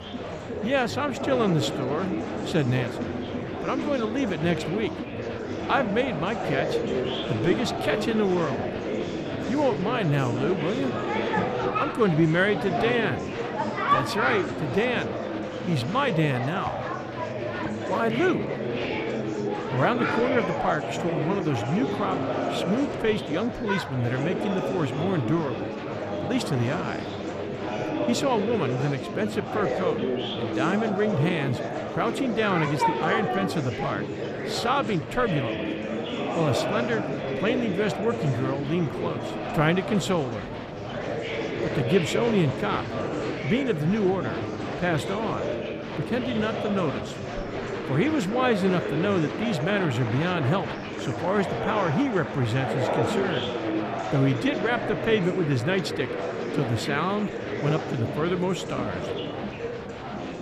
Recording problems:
murmuring crowd; loud; throughout; 3 dB below the speech

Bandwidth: 15 kHz